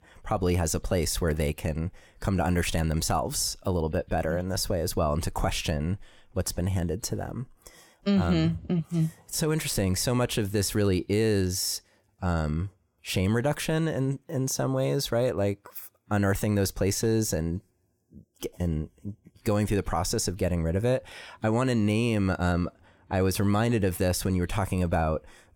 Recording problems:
none

